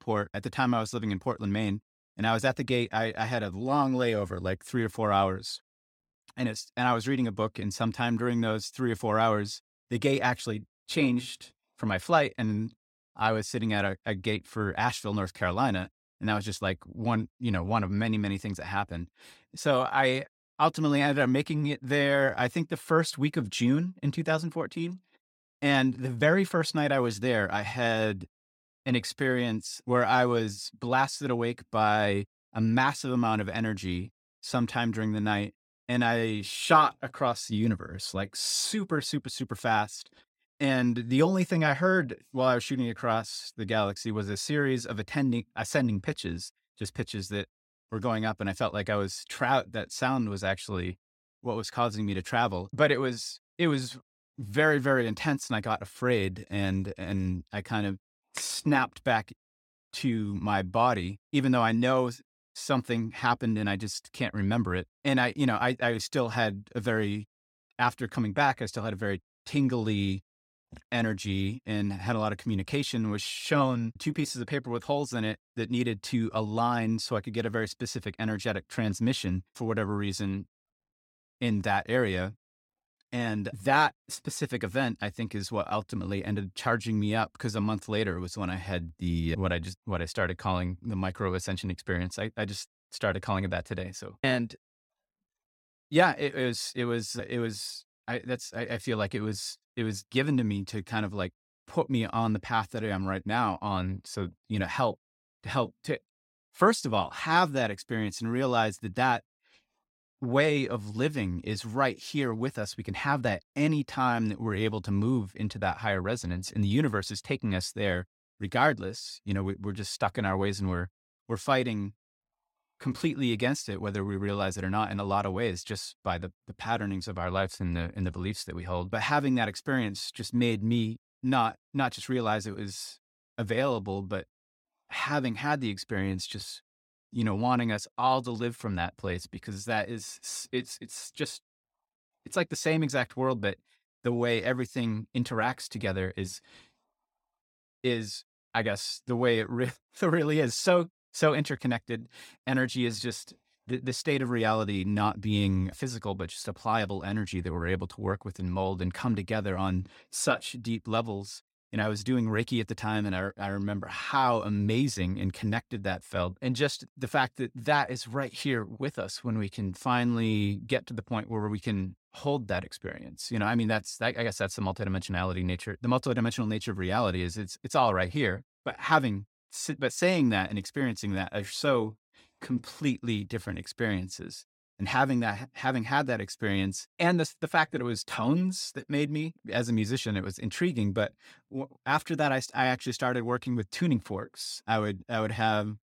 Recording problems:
none

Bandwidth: 16.5 kHz